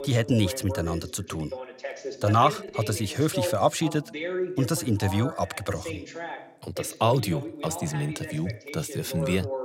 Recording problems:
voice in the background; loud; throughout; 9 dB below the speech

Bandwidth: 16 kHz